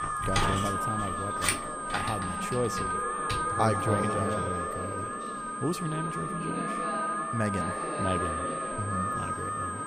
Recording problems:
echo of what is said; strong; throughout; 130 ms later, 9 dB below the speech
alarms or sirens; very loud; throughout; 1 dB above the speech
household noises; very loud; until 3.5 s; as loud as the speech
high-pitched whine; loud; throughout; 8.5 kHz, 9 dB below the speech
voice in the background; loud; throughout; 8 dB below the speech

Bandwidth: 15.5 kHz